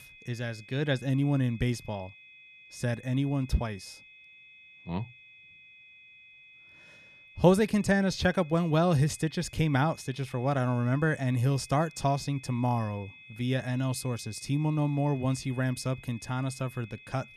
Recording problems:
high-pitched whine; faint; throughout; 2.5 kHz, 20 dB below the speech

